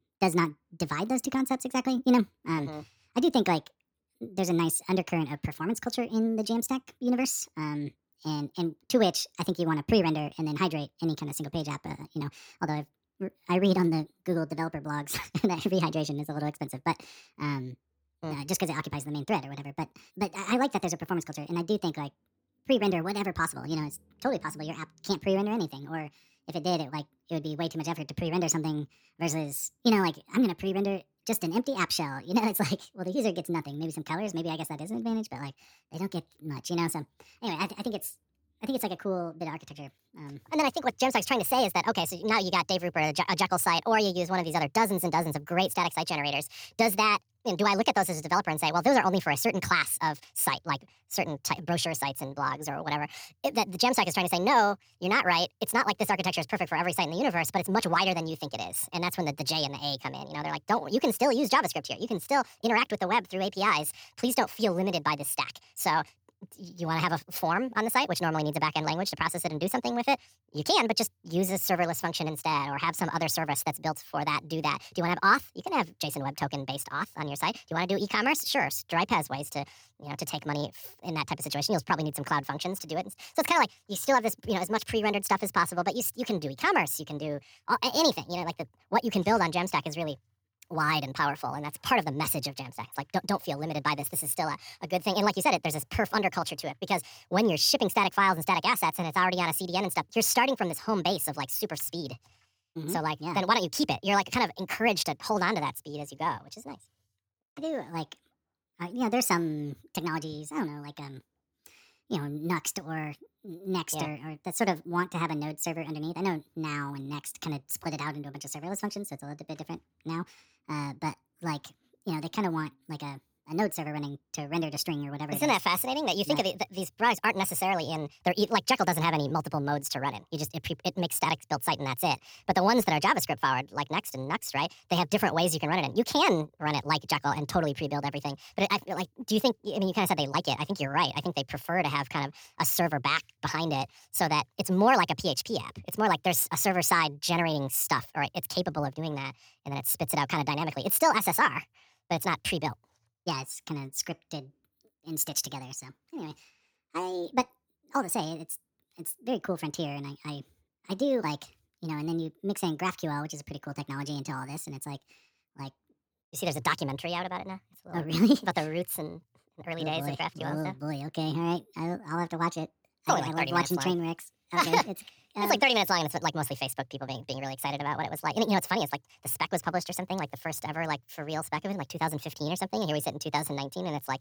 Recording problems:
wrong speed and pitch; too fast and too high; 1.6 times normal speed

